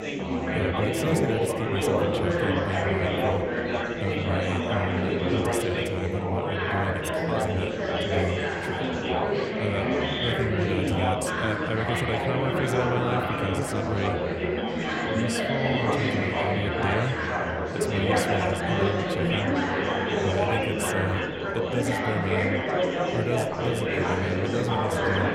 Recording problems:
chatter from many people; very loud; throughout; 5 dB above the speech

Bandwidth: 16 kHz